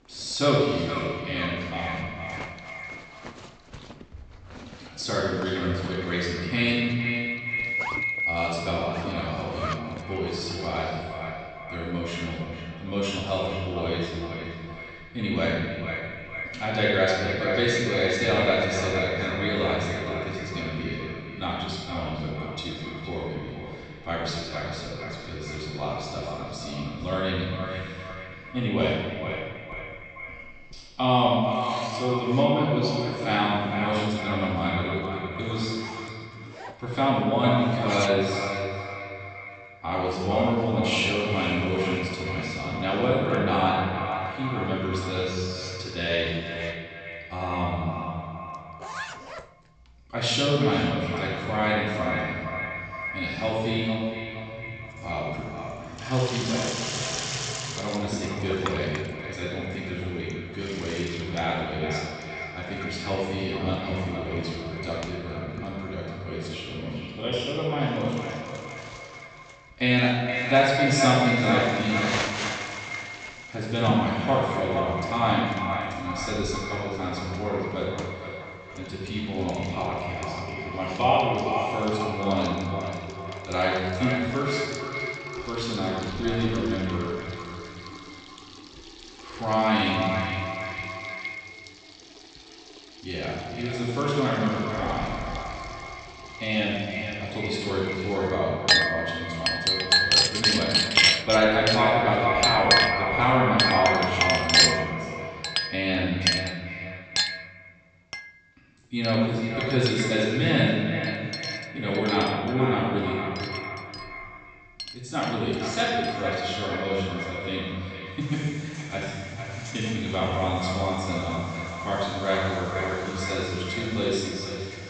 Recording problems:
echo of what is said; strong; throughout; 460 ms later, 6 dB below the speech
room echo; strong; dies away in 1.6 s
off-mic speech; far
high frequencies cut off; noticeable; nothing above 8 kHz
household noises; loud; throughout; as loud as the speech

